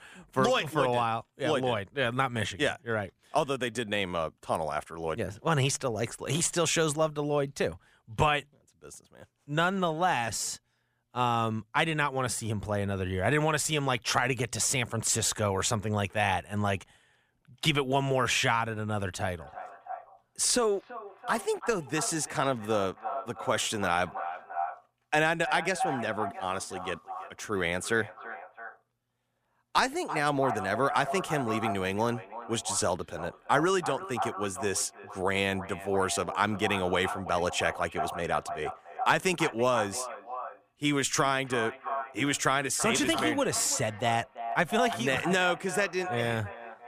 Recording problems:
echo of what is said; strong; from 19 s on; 330 ms later, 9 dB below the speech

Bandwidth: 15 kHz